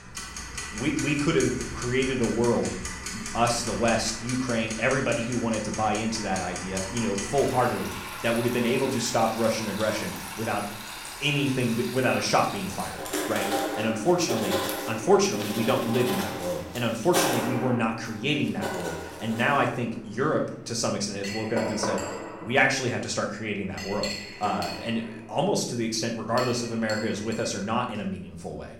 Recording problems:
room echo; slight; dies away in 0.5 s
off-mic speech; somewhat distant
household noises; loud; throughout; 7 dB below the speech

